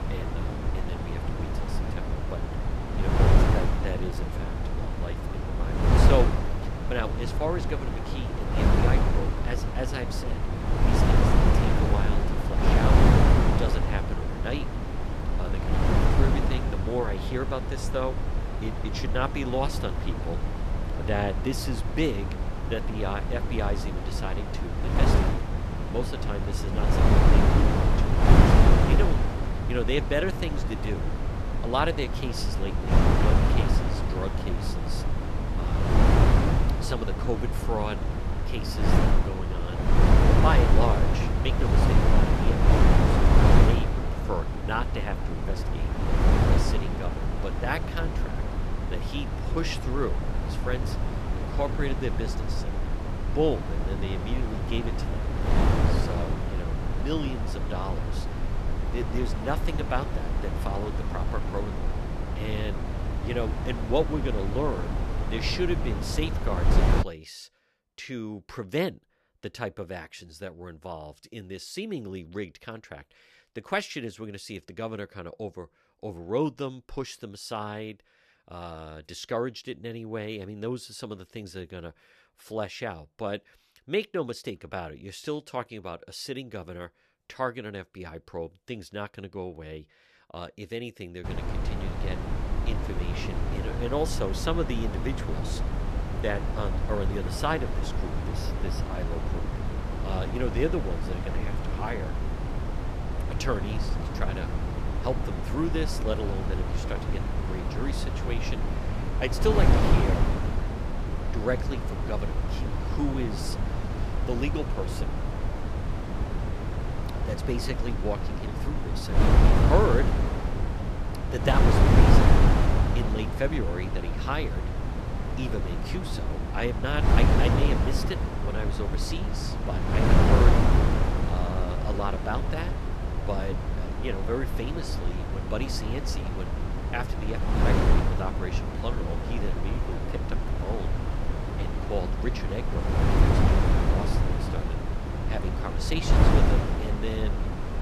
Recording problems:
wind noise on the microphone; heavy; until 1:07 and from 1:31 on; 1 dB above the speech

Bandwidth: 14 kHz